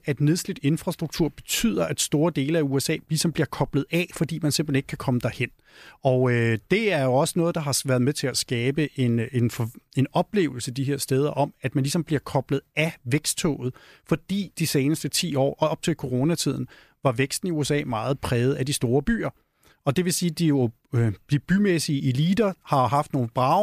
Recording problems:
abrupt cut into speech; at the end

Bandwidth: 14.5 kHz